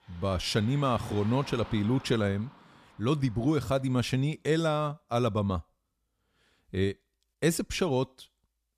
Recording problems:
traffic noise; faint; until 3.5 s; 20 dB below the speech

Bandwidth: 14.5 kHz